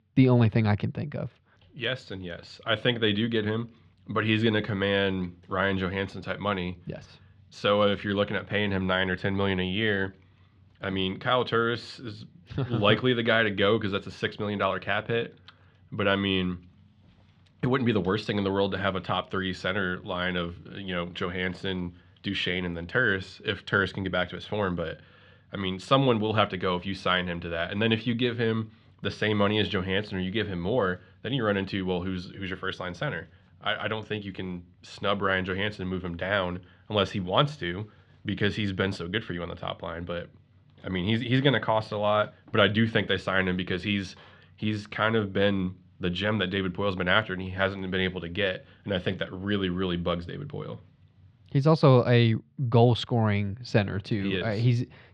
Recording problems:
muffled; slightly; fading above 3.5 kHz

